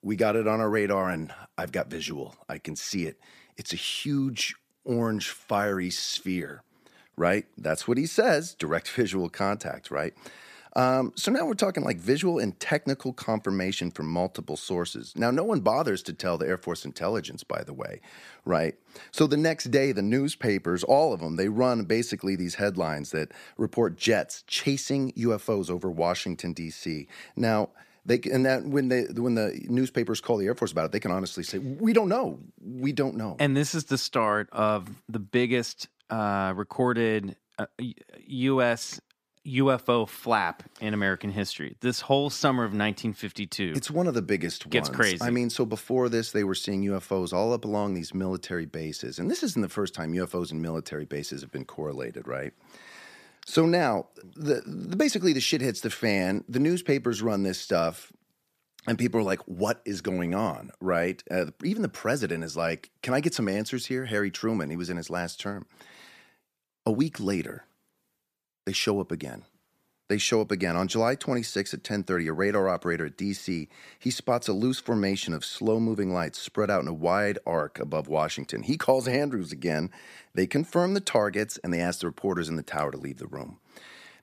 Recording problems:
none

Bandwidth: 14.5 kHz